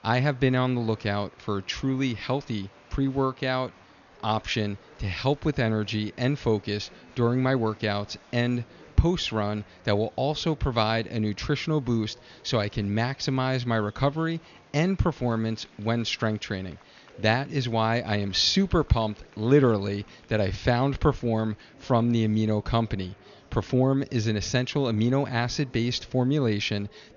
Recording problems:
high frequencies cut off; noticeable; nothing above 7 kHz
murmuring crowd; faint; throughout; 25 dB below the speech

